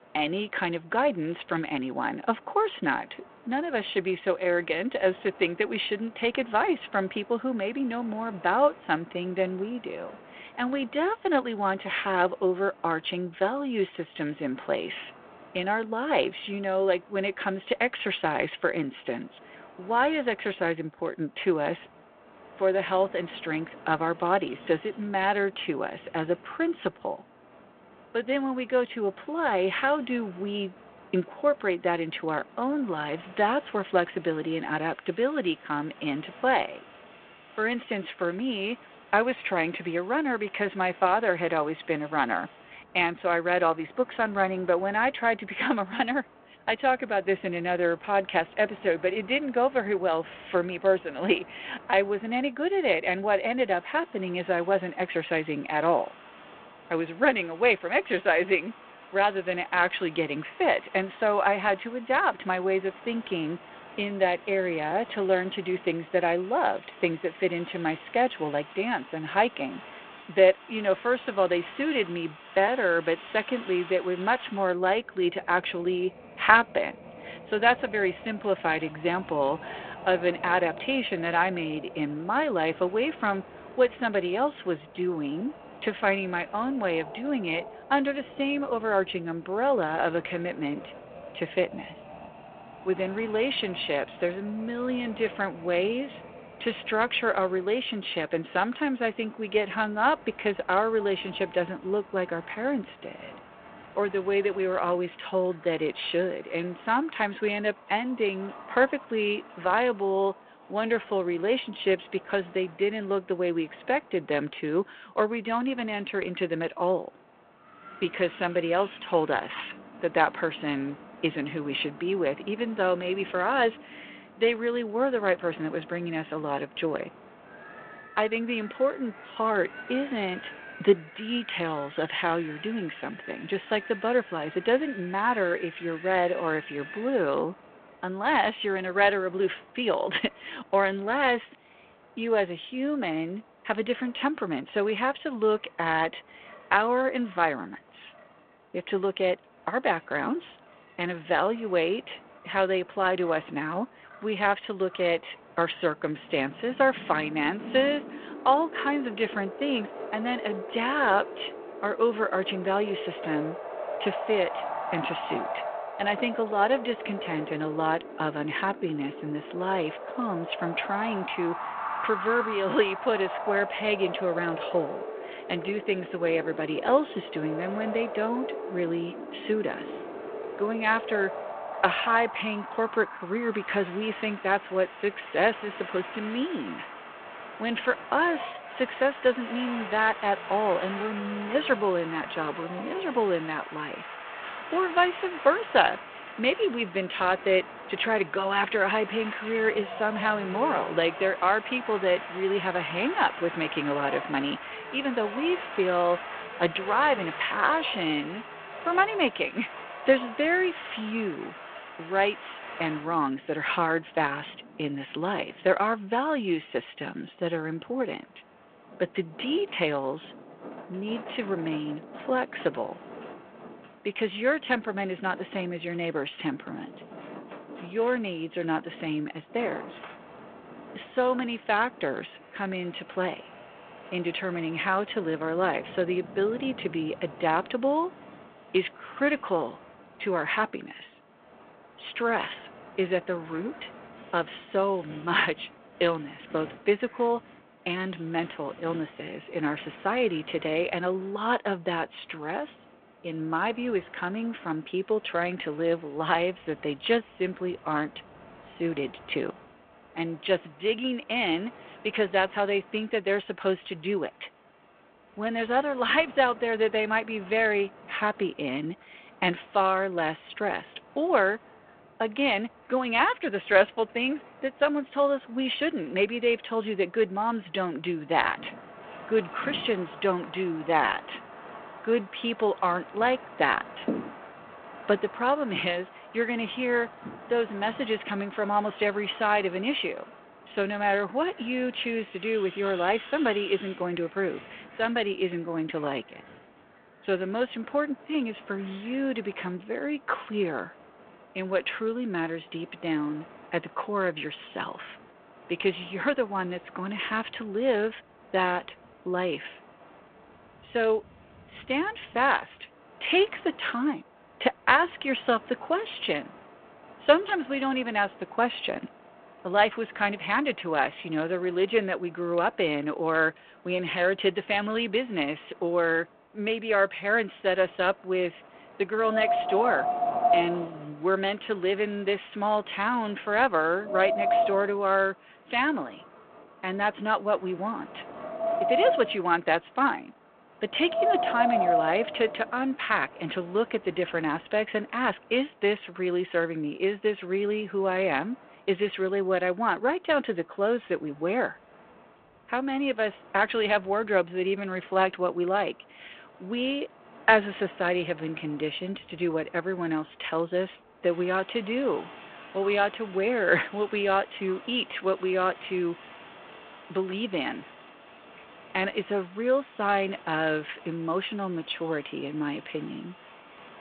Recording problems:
phone-call audio
wind in the background; noticeable; throughout; 10 dB below the speech

